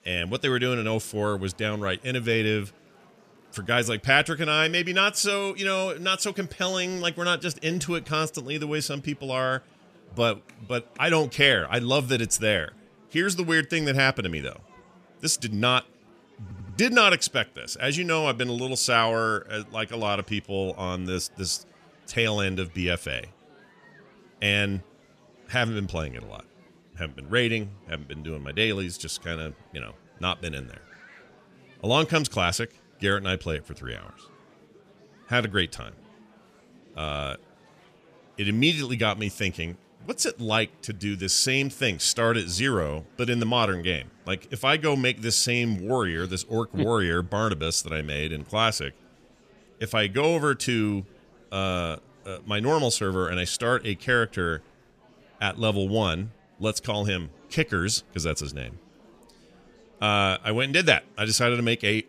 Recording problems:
murmuring crowd; faint; throughout; 30 dB below the speech
audio stuttering; at 16 s

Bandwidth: 14.5 kHz